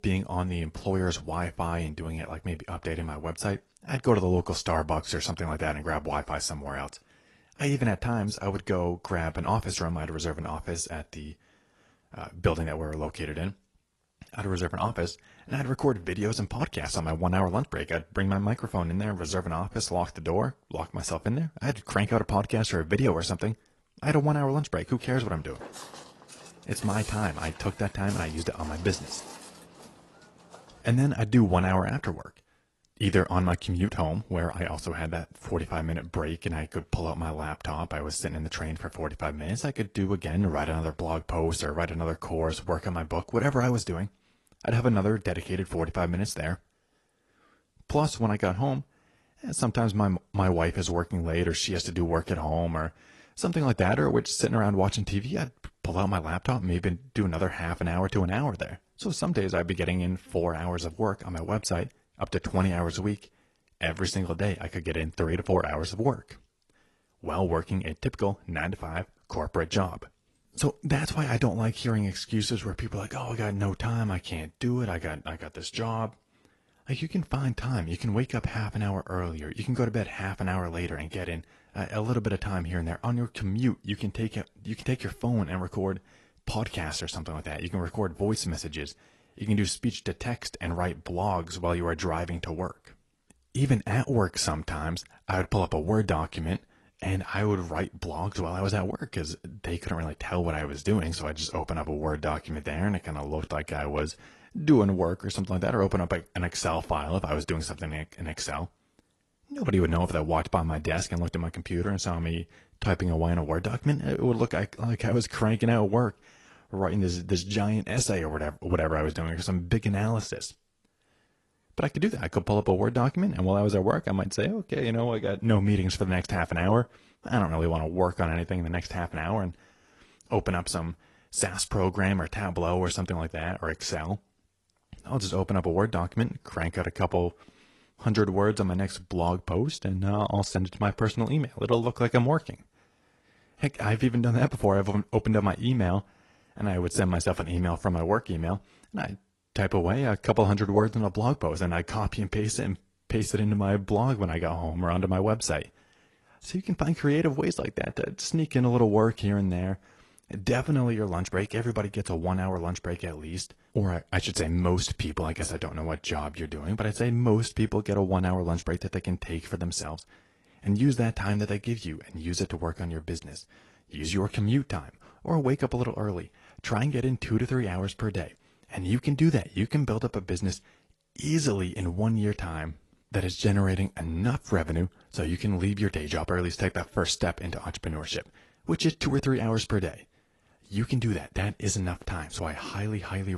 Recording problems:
garbled, watery; slightly; nothing above 11 kHz
footsteps; faint; from 25 to 31 s; peak 10 dB below the speech
abrupt cut into speech; at the end

